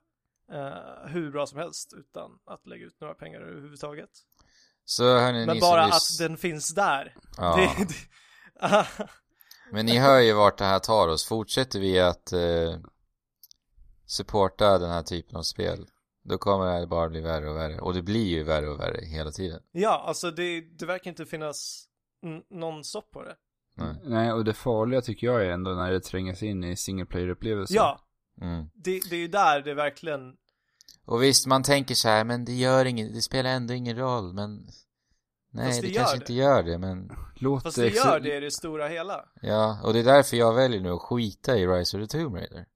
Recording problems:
none

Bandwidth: 14.5 kHz